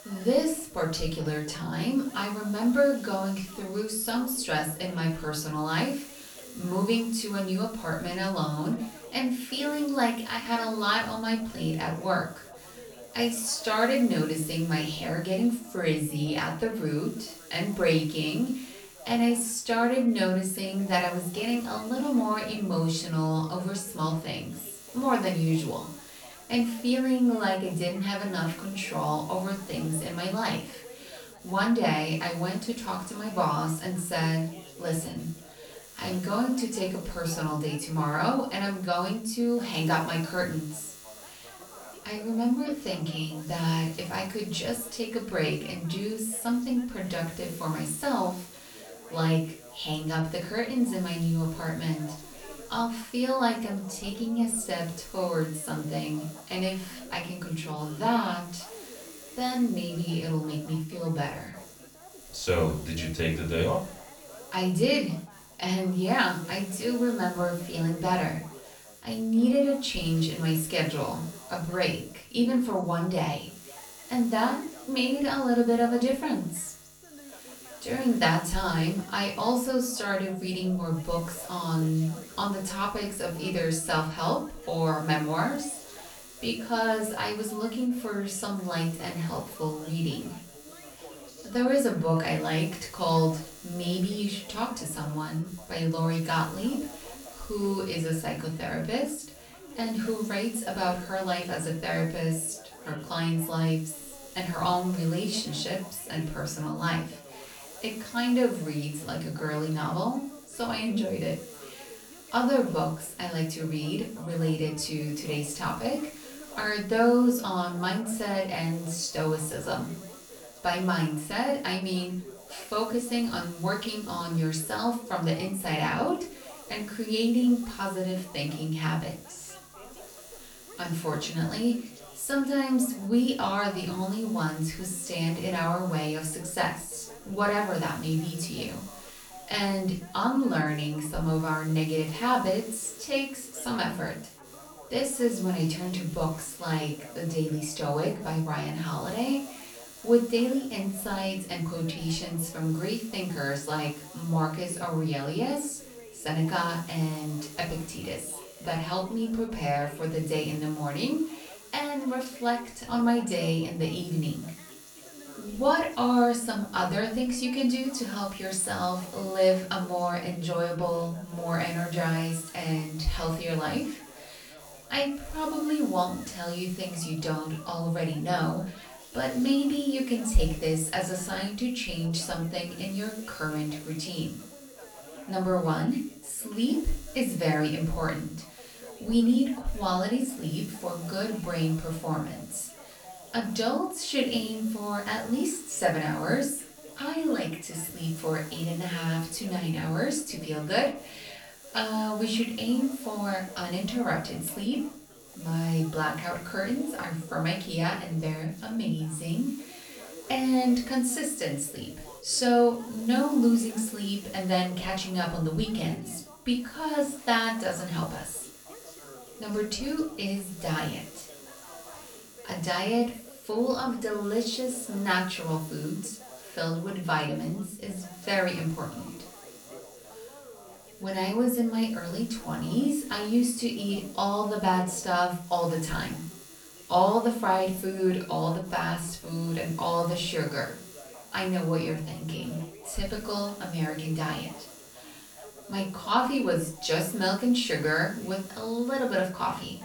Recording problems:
off-mic speech; far
room echo; slight; dies away in 0.3 s
electrical hum; faint; throughout; 50 Hz, 20 dB below the speech
background chatter; faint; throughout; 3 voices, 20 dB below the speech

